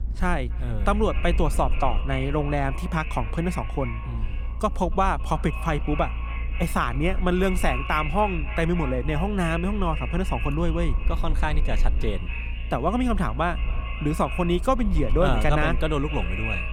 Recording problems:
echo of what is said; strong; throughout; 280 ms later, 10 dB below the speech
low rumble; faint; throughout; 25 dB below the speech

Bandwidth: 18.5 kHz